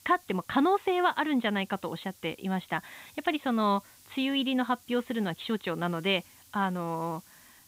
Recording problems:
high frequencies cut off; severe; nothing above 4 kHz
hiss; faint; throughout; 25 dB below the speech

